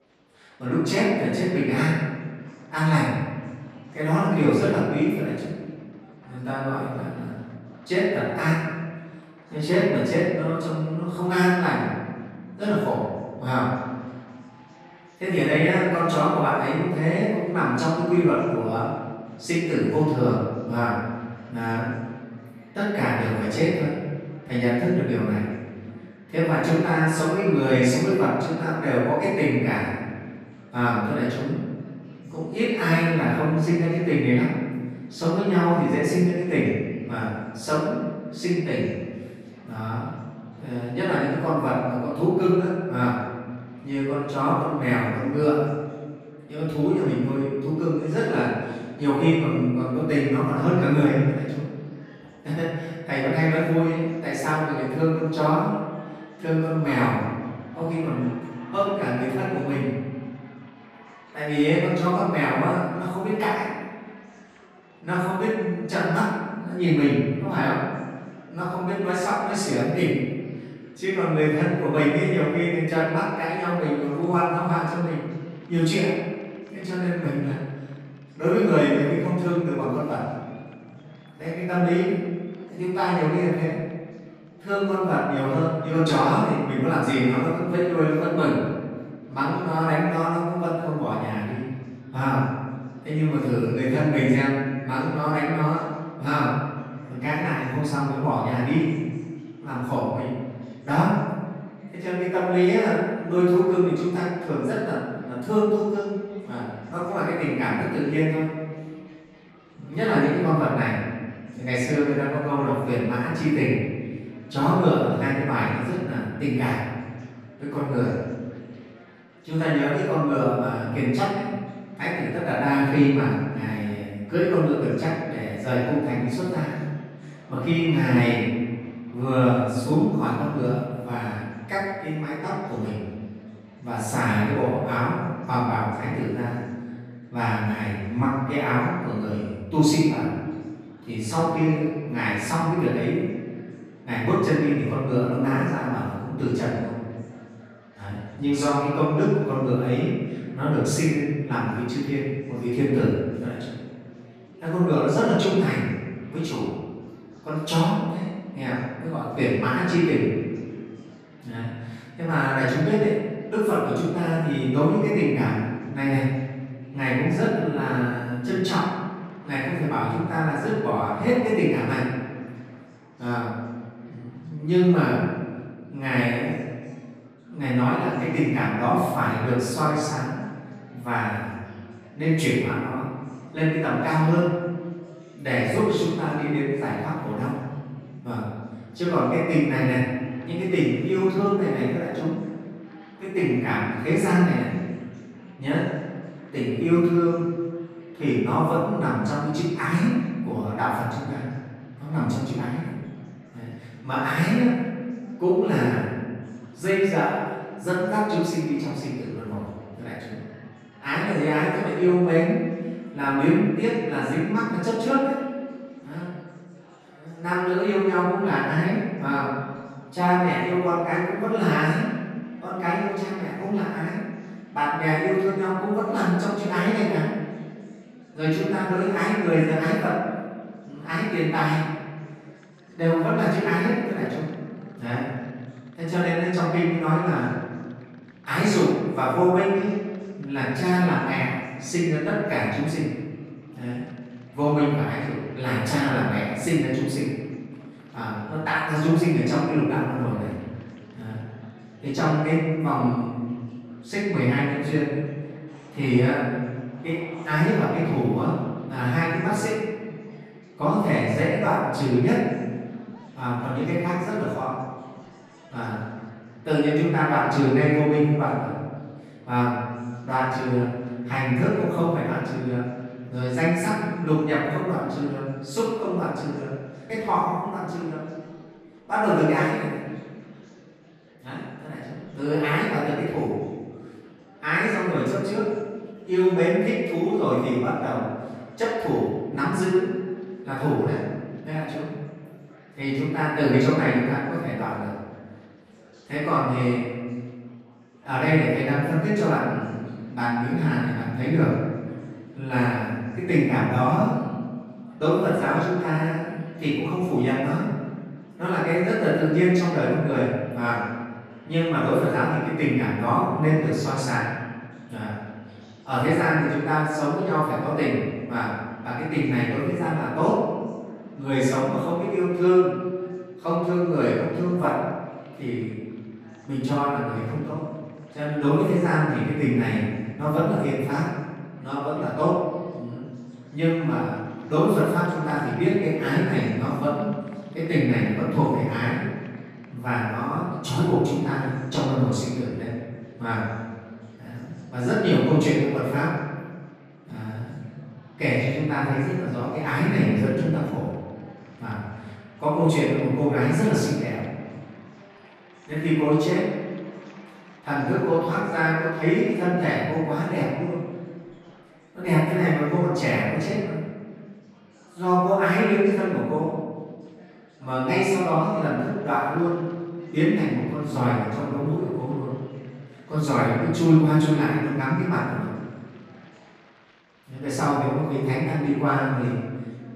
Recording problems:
room echo; strong; dies away in 1.5 s
off-mic speech; far
murmuring crowd; faint; throughout; 25 dB below the speech

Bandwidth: 14.5 kHz